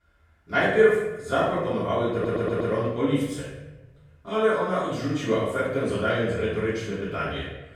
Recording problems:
room echo; strong; dies away in 1 s
off-mic speech; far
audio stuttering; at 2 s

